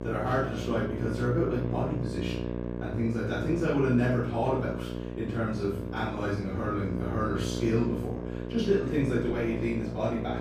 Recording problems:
off-mic speech; far
room echo; noticeable; dies away in 0.6 s
electrical hum; loud; throughout; 60 Hz, 7 dB below the speech
voice in the background; faint; throughout; 20 dB below the speech

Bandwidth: 15.5 kHz